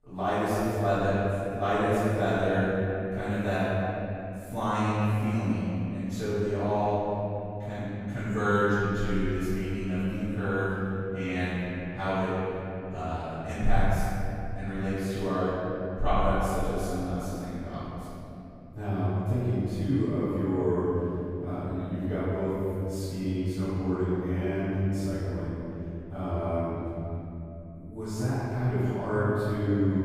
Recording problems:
room echo; strong; dies away in 3 s
off-mic speech; far

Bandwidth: 15.5 kHz